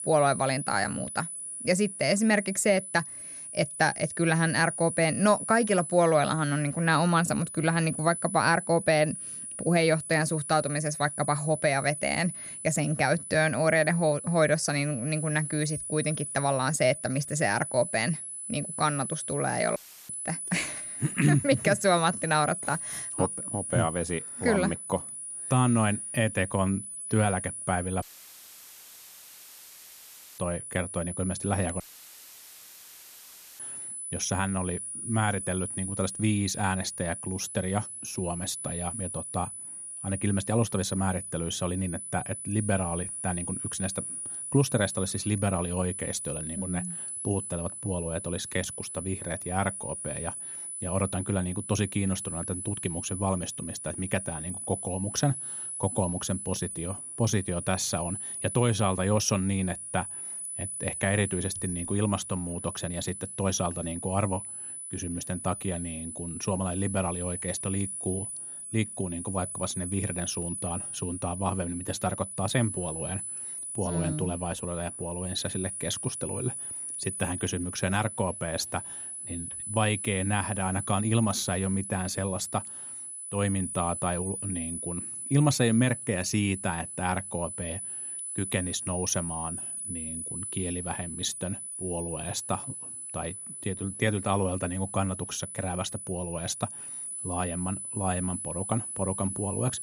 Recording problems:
high-pitched whine; loud; throughout; 10 kHz, 6 dB below the speech
audio cutting out; filled with static; at 20 s, at 28 s for 2.5 s and at 32 s for 2 s

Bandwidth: 14.5 kHz